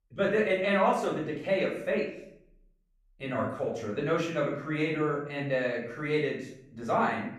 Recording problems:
off-mic speech; far
room echo; noticeable; dies away in 0.6 s

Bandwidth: 14.5 kHz